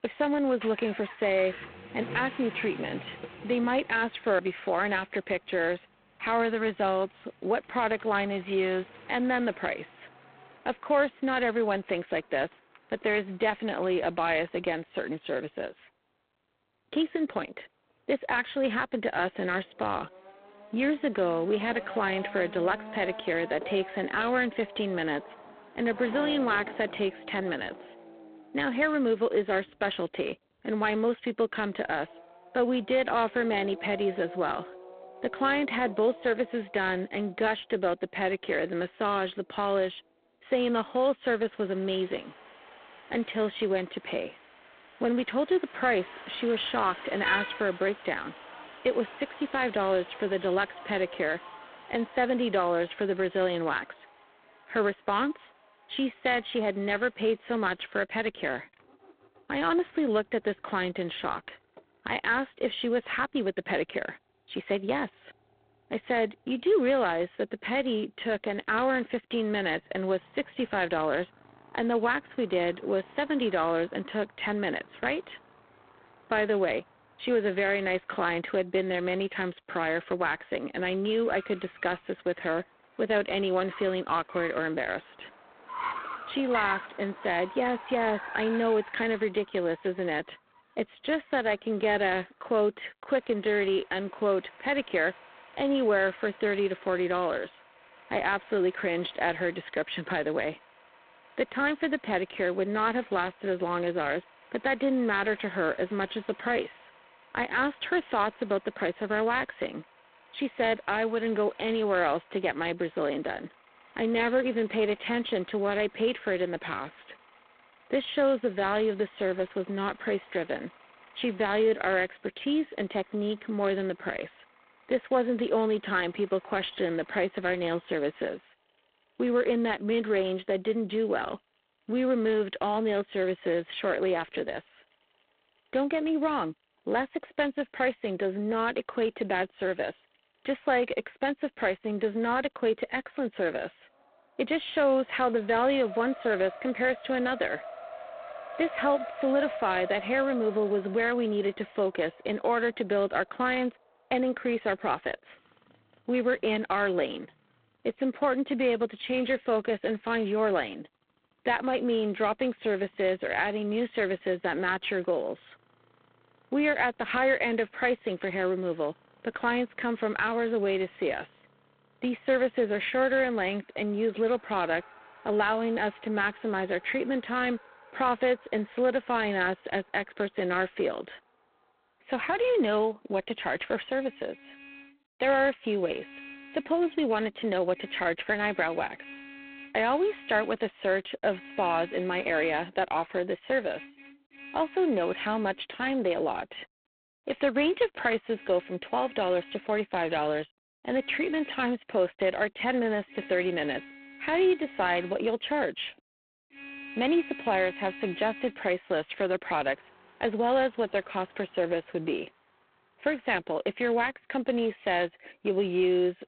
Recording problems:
phone-call audio; poor line; nothing above 3.5 kHz
traffic noise; noticeable; throughout; 15 dB below the speech

